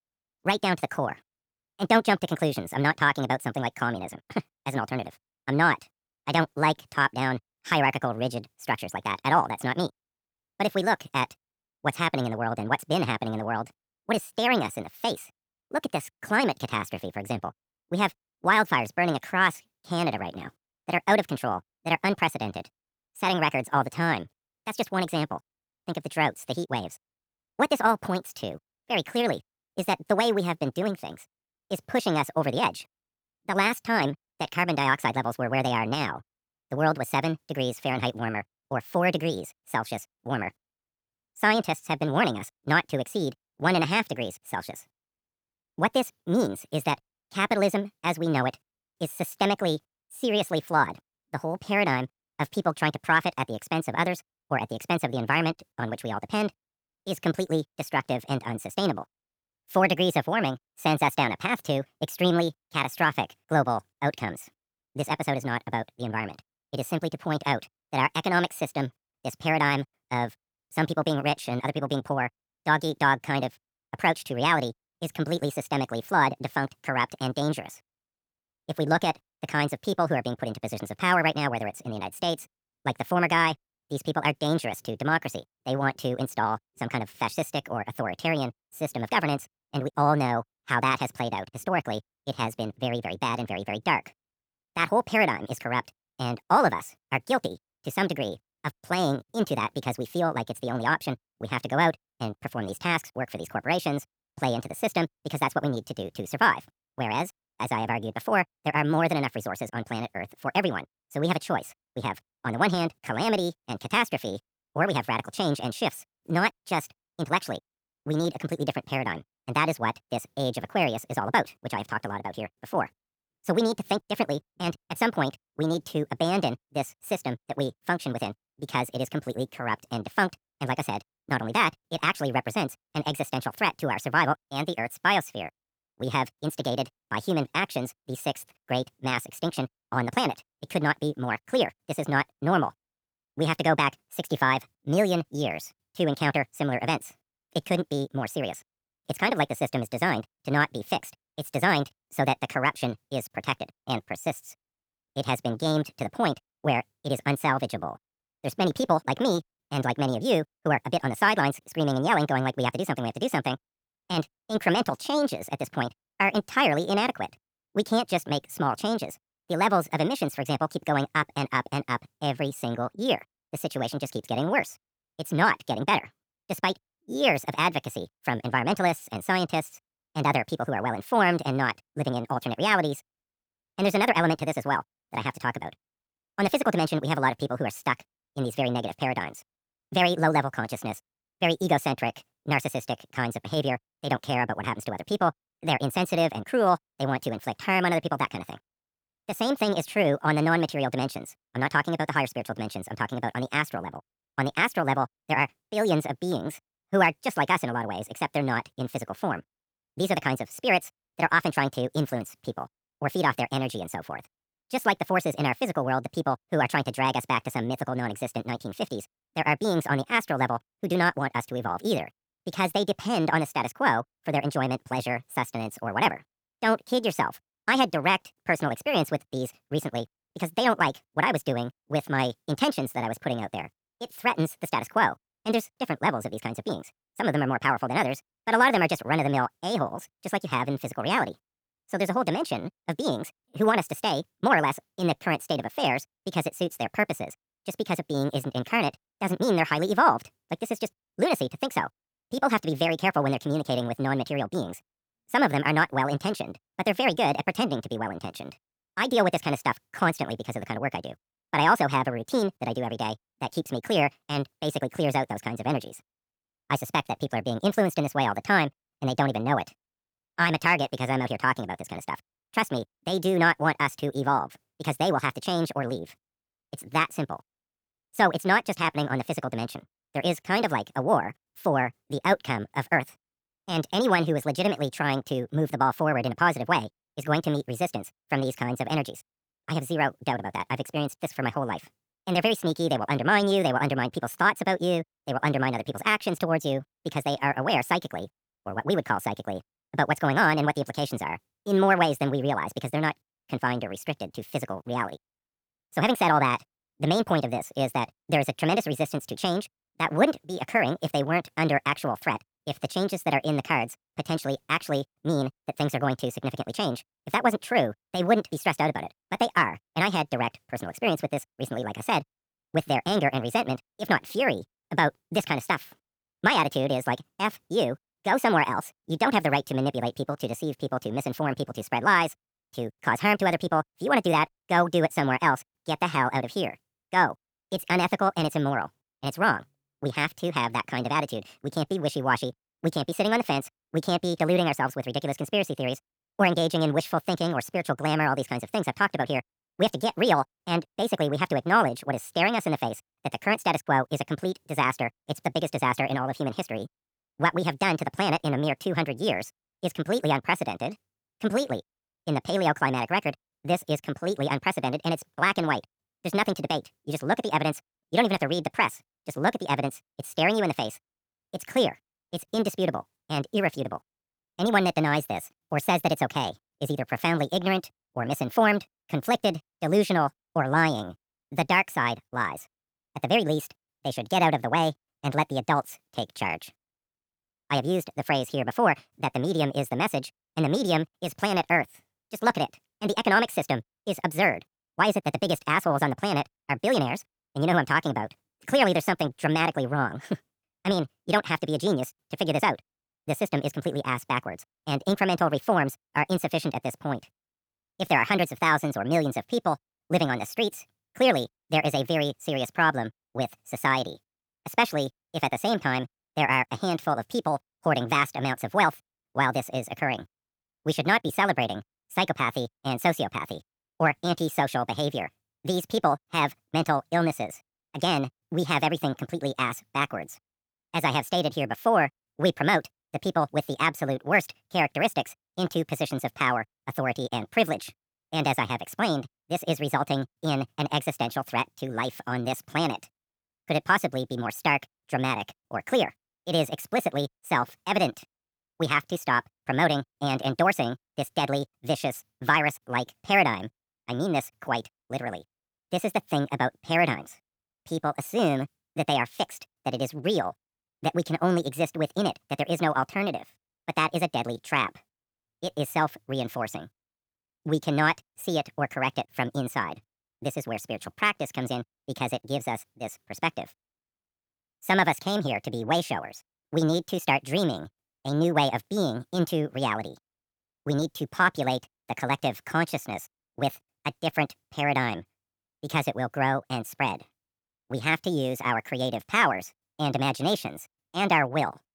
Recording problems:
wrong speed and pitch; too fast and too high; 1.6 times normal speed

